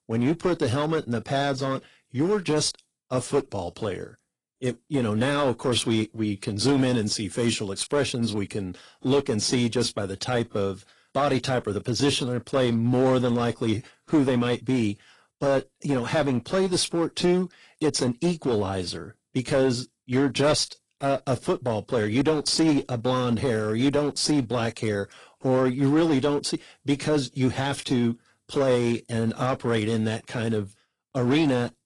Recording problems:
distortion; slight; 5% of the sound clipped
garbled, watery; slightly; nothing above 10 kHz

